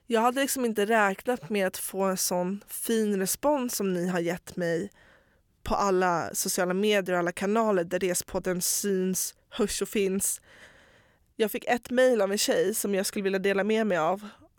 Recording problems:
none

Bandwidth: 17.5 kHz